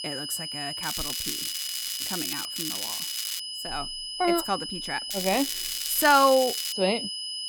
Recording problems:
high-pitched whine; loud; throughout; 5 kHz, 6 dB below the speech
crackling; loud; from 1 to 2.5 s, at 2.5 s and from 5 to 6.5 s; 5 dB below the speech

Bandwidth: 17.5 kHz